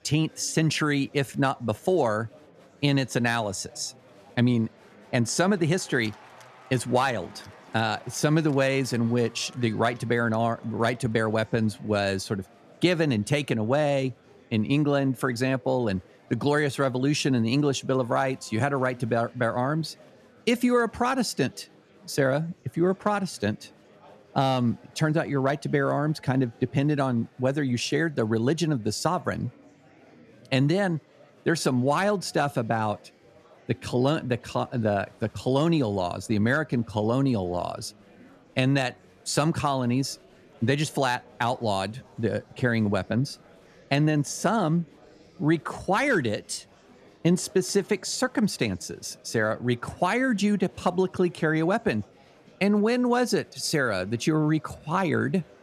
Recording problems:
murmuring crowd; faint; throughout; 25 dB below the speech

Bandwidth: 13.5 kHz